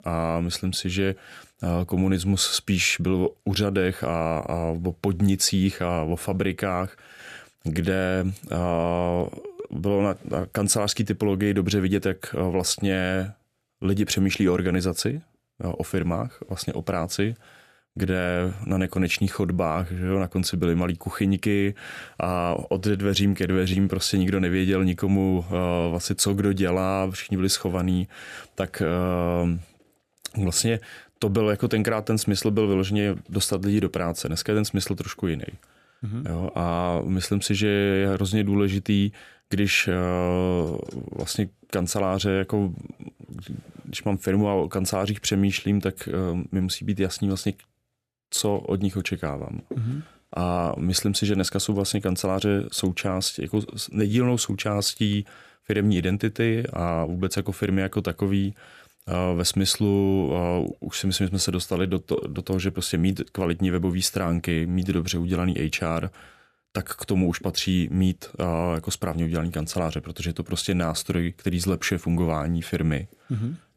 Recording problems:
none

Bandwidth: 14.5 kHz